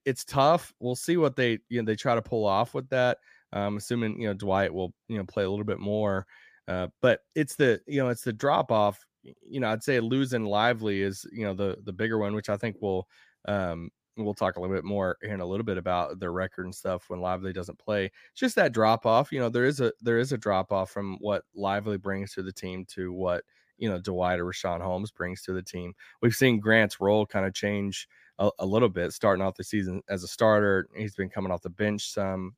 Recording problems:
none

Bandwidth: 15 kHz